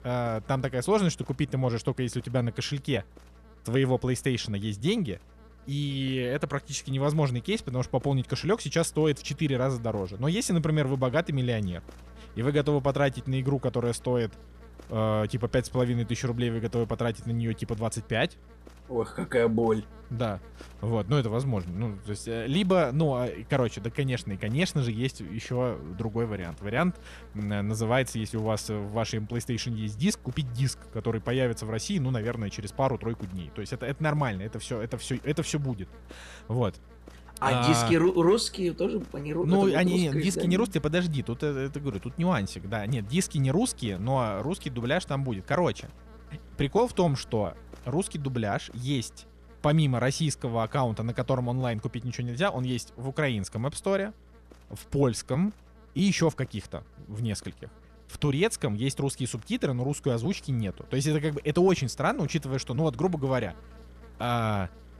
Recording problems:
electrical hum; faint; throughout; 60 Hz, 25 dB below the speech

